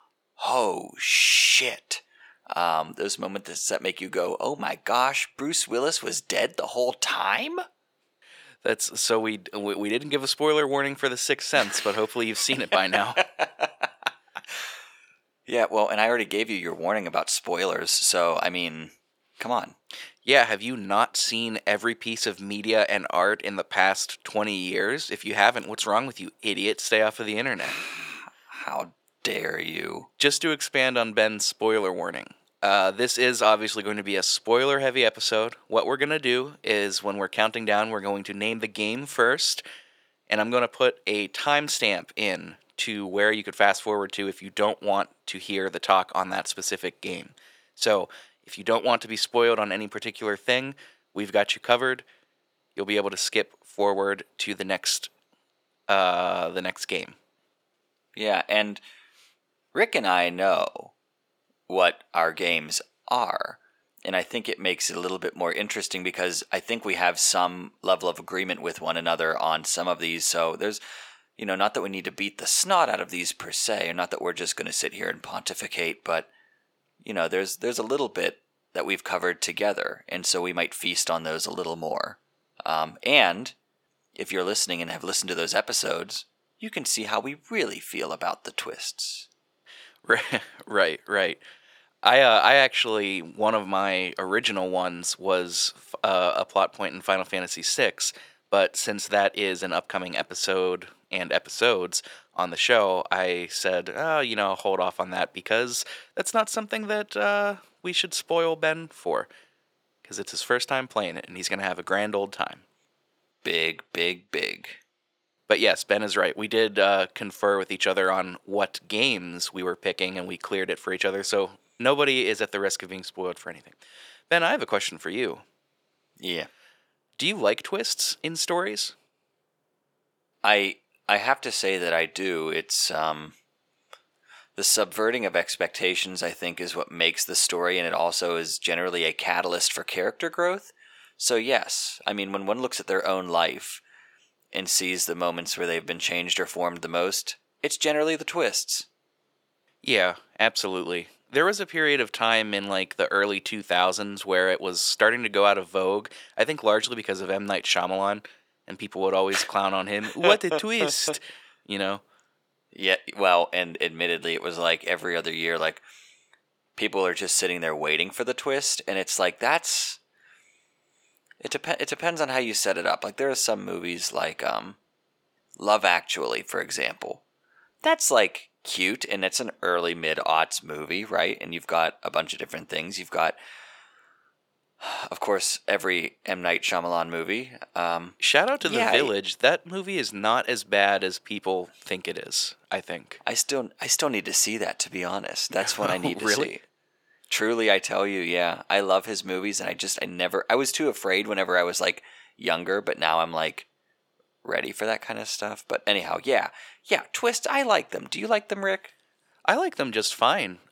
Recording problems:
thin; very; fading below 500 Hz

